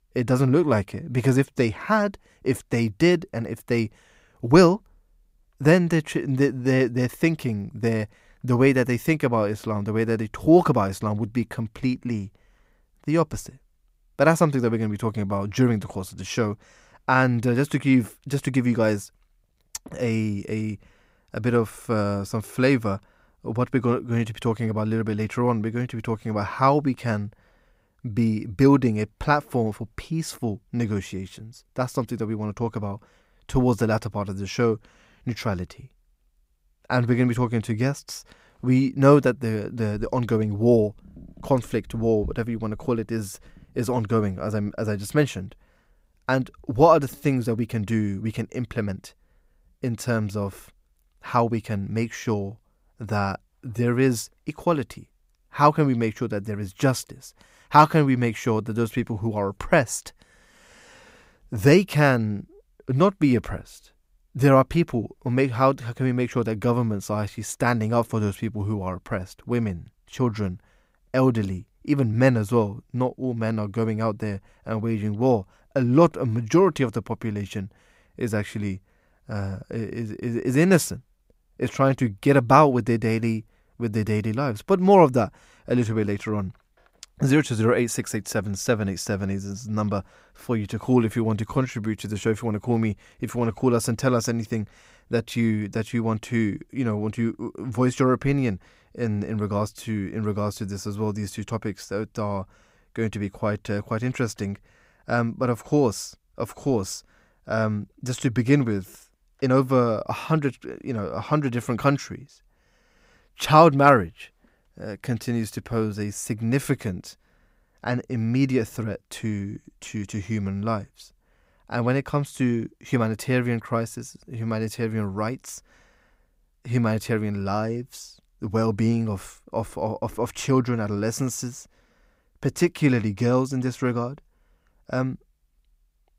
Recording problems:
uneven, jittery; slightly; from 20 s to 1:50

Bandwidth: 15.5 kHz